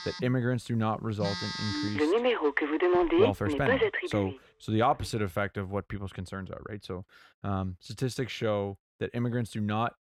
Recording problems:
alarms or sirens; very loud; until 4.5 s; 4 dB above the speech

